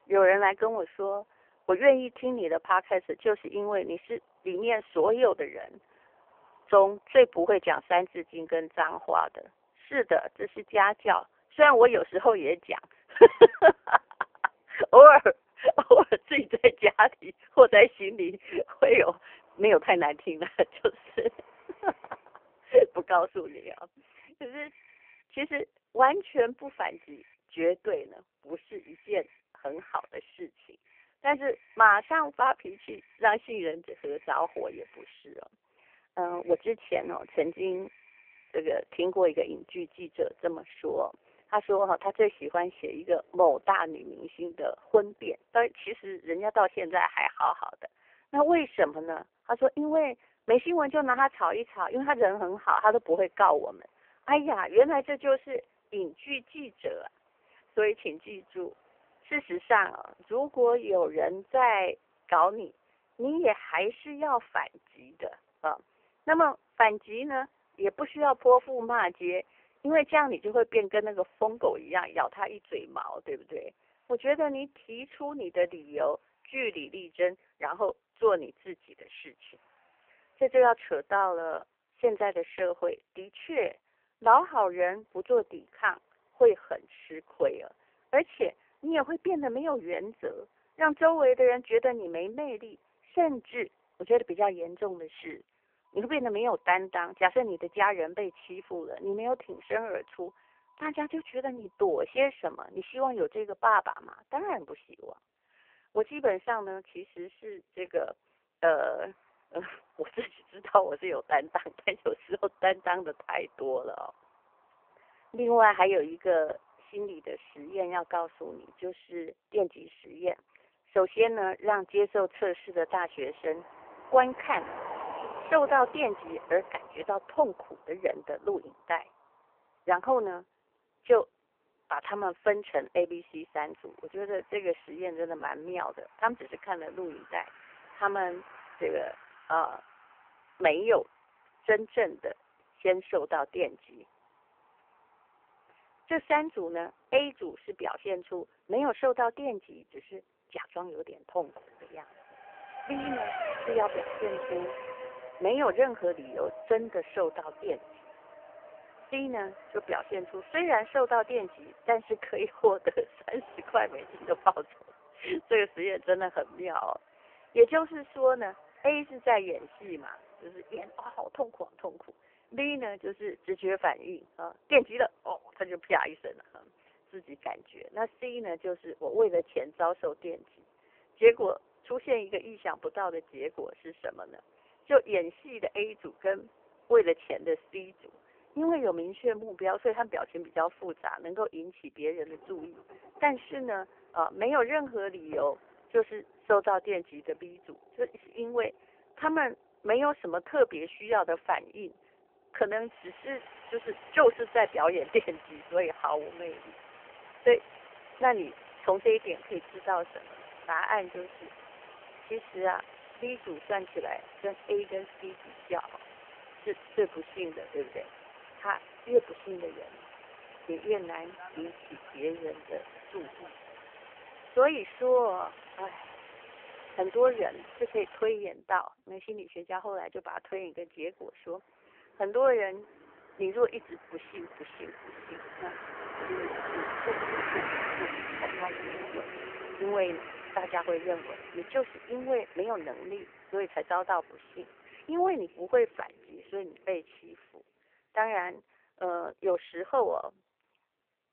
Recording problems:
phone-call audio; poor line; nothing above 3 kHz
traffic noise; noticeable; throughout; 15 dB below the speech

